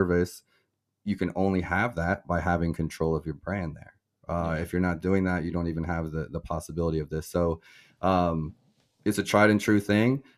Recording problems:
abrupt cut into speech; at the start

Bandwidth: 14.5 kHz